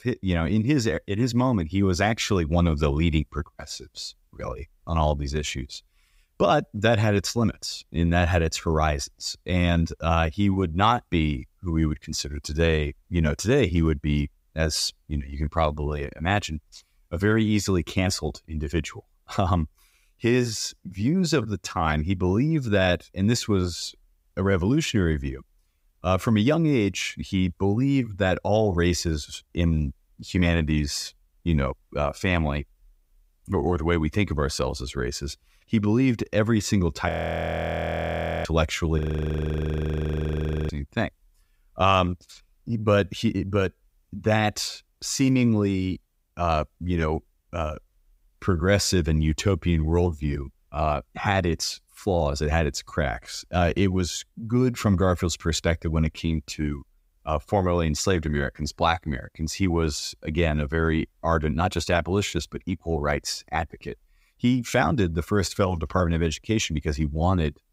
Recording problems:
audio freezing; at 37 s for 1.5 s and at 39 s for 1.5 s

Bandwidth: 15.5 kHz